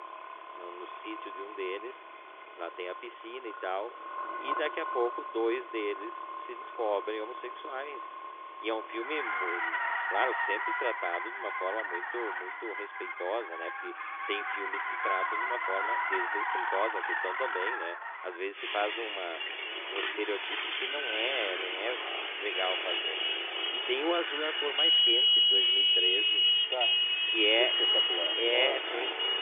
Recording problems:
phone-call audio; nothing above 3.5 kHz
traffic noise; very loud; throughout; 8 dB above the speech

